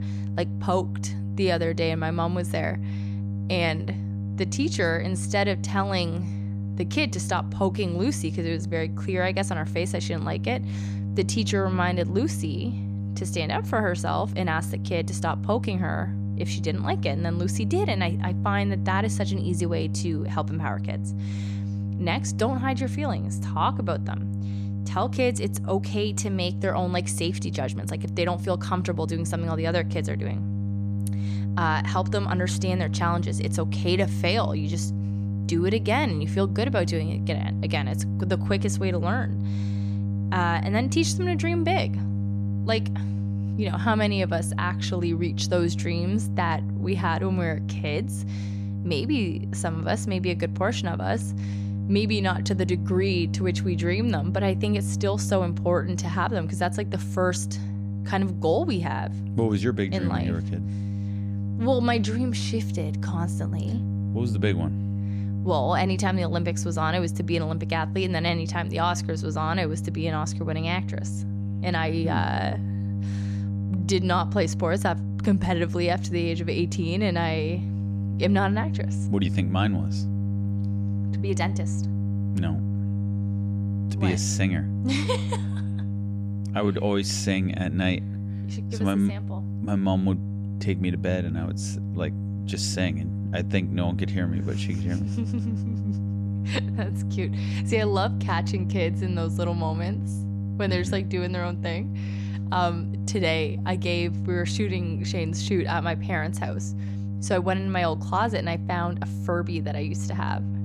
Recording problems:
electrical hum; noticeable; throughout; 50 Hz, 10 dB below the speech

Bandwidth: 15 kHz